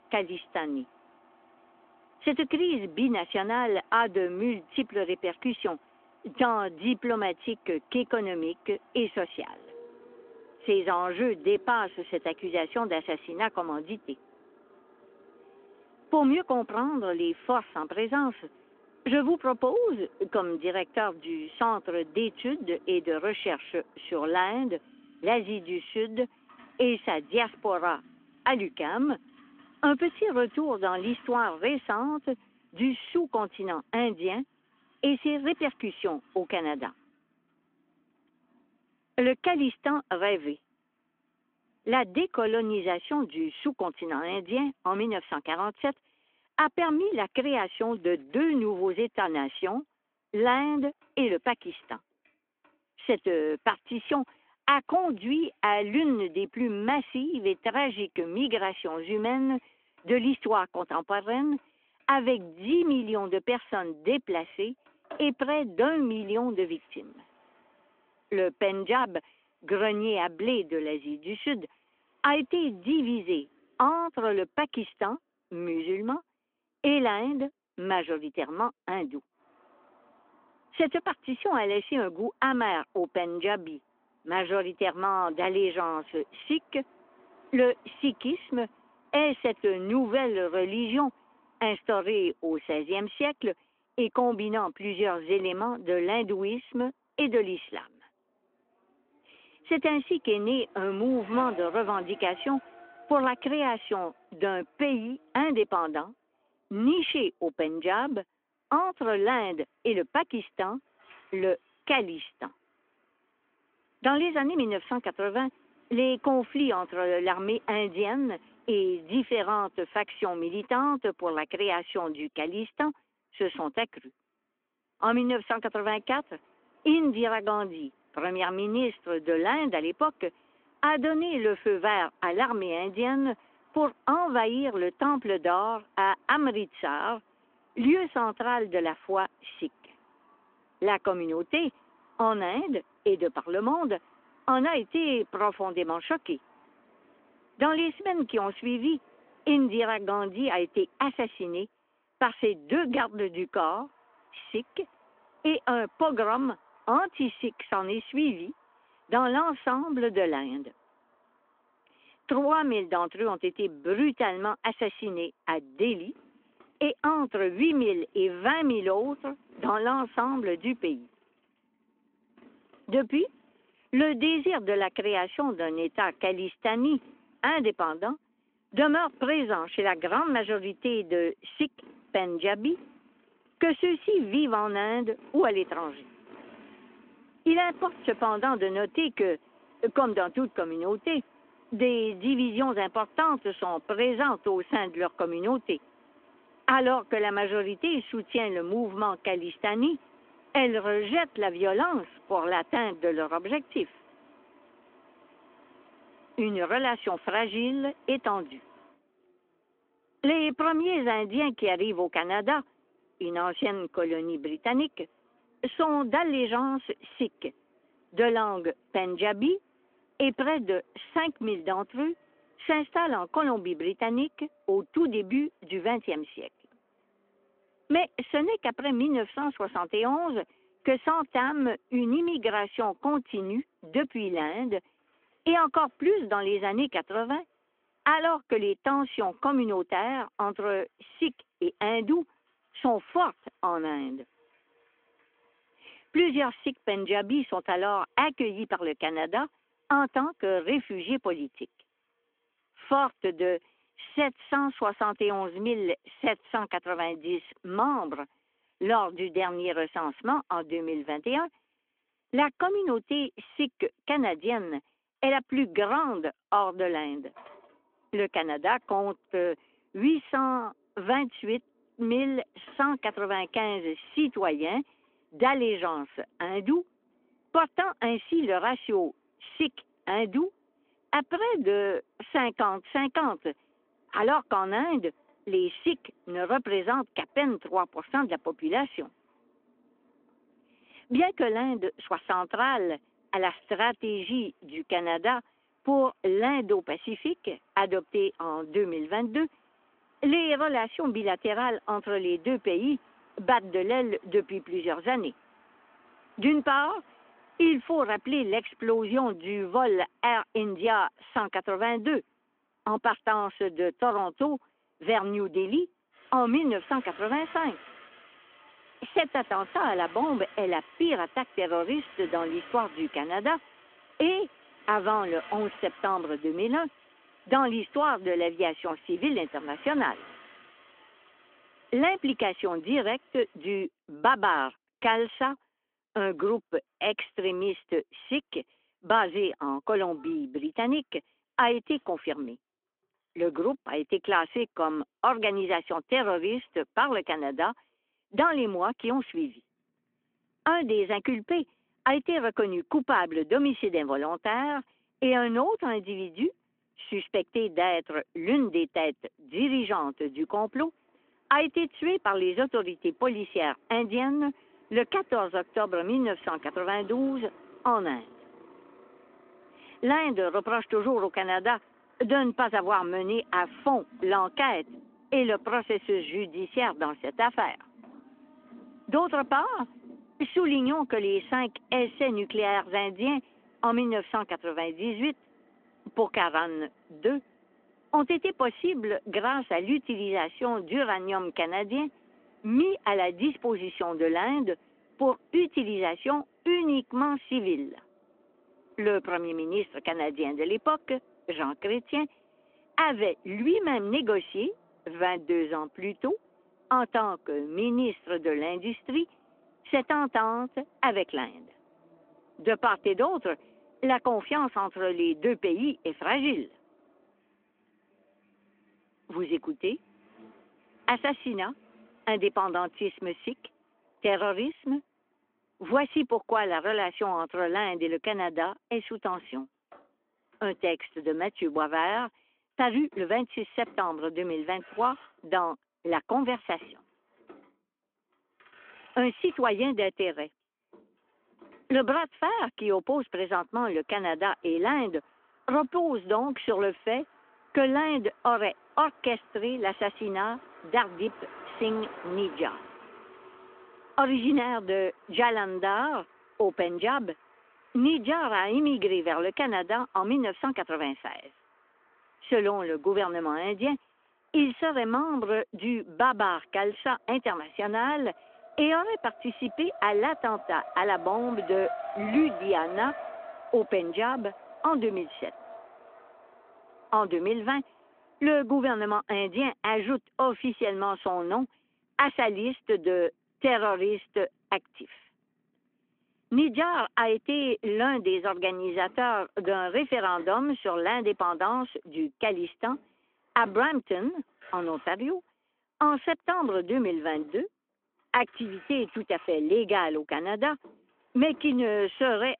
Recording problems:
phone-call audio
traffic noise; faint; throughout; 25 dB below the speech

